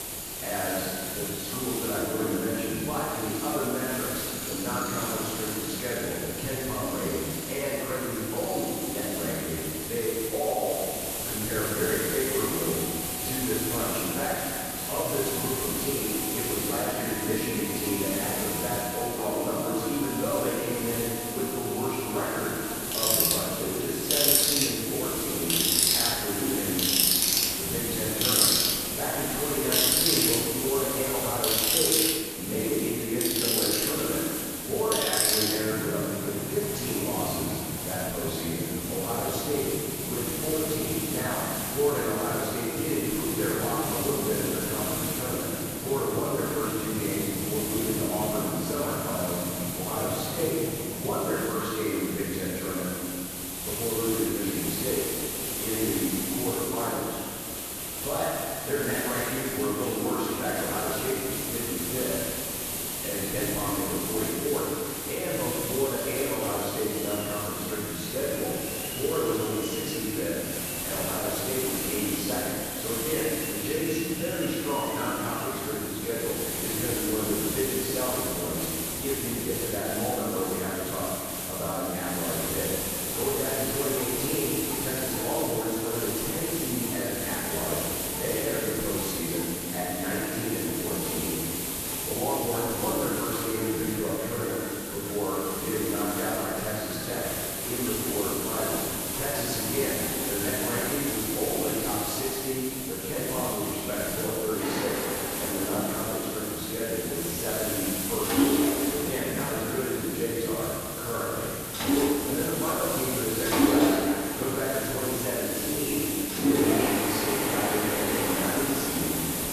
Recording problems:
room echo; strong; dies away in 2.1 s
off-mic speech; far
machinery noise; very loud; throughout; 1 dB above the speech
hiss; loud; throughout; as loud as the speech

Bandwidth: 14 kHz